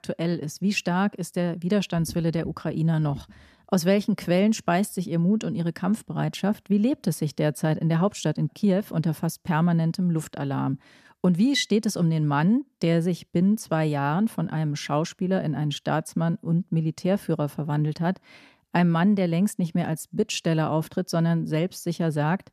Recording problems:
none

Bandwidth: 14.5 kHz